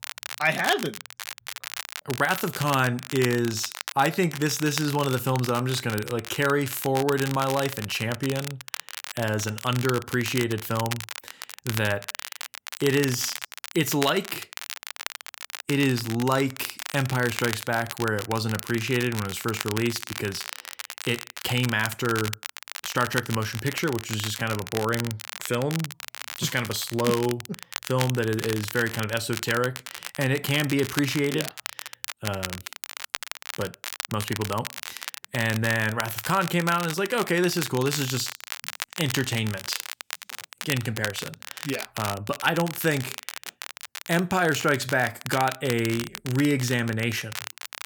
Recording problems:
crackle, like an old record; loud; 9 dB below the speech

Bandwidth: 19 kHz